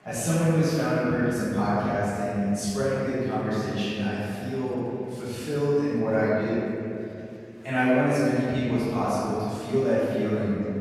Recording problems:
room echo; strong; dies away in 2.5 s
off-mic speech; far
murmuring crowd; faint; throughout; 25 dB below the speech

